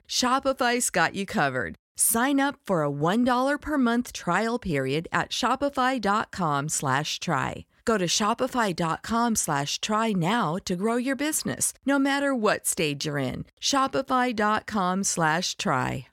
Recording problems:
none

